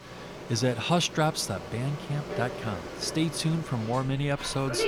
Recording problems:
animal sounds; loud; throughout; 10 dB below the speech

